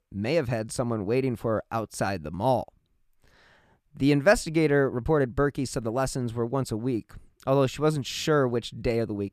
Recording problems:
none

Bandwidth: 14.5 kHz